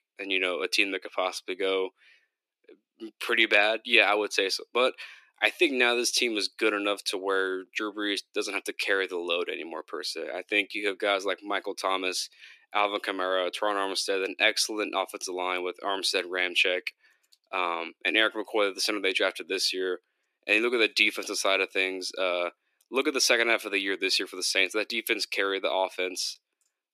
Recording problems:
thin; somewhat; fading below 300 Hz

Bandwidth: 14.5 kHz